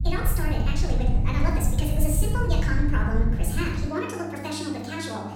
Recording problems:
off-mic speech; far
wrong speed and pitch; too fast and too high; 1.5 times normal speed
room echo; noticeable; dies away in 0.8 s
electrical hum; noticeable; from 1 s on; 50 Hz, 15 dB below the speech
low rumble; noticeable; until 4 s; 10 dB below the speech

